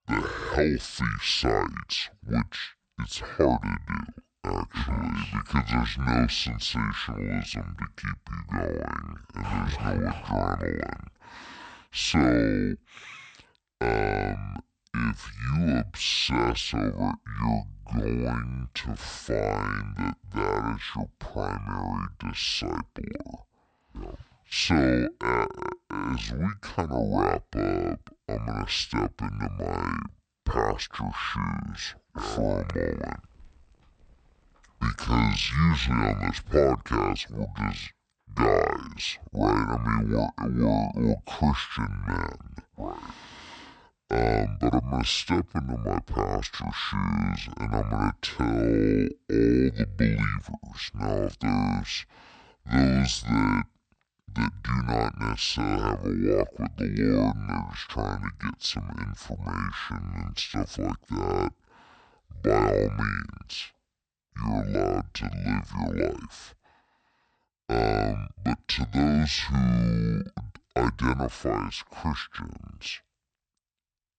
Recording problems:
wrong speed and pitch; too slow and too low; 0.5 times normal speed

